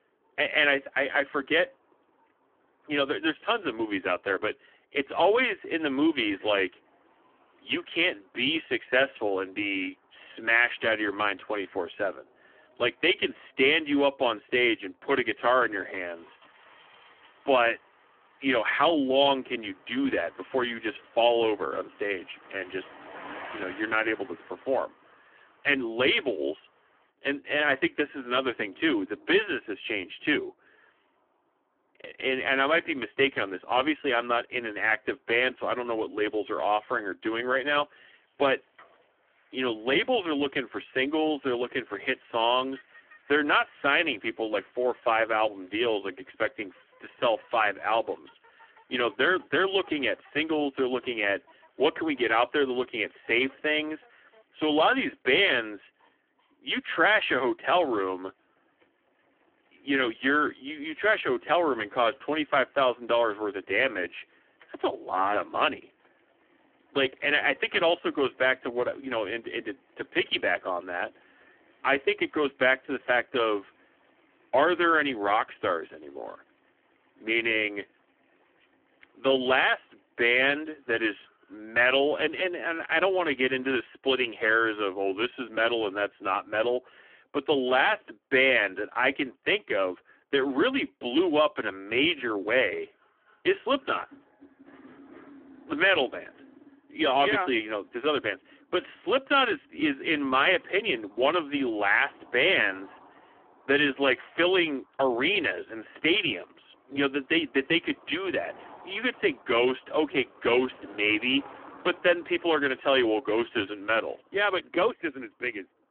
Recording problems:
phone-call audio; poor line; nothing above 3.5 kHz
traffic noise; faint; throughout; 30 dB below the speech

